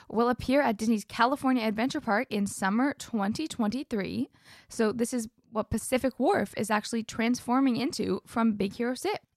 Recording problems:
none

